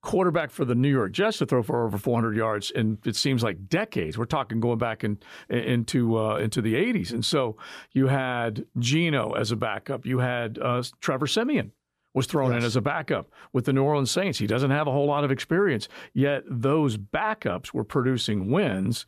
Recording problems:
none

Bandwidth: 14.5 kHz